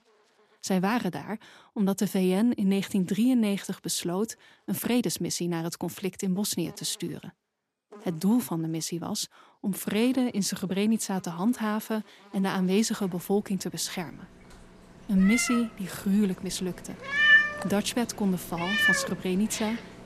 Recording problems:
animal sounds; very loud; throughout; 3 dB above the speech

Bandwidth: 14 kHz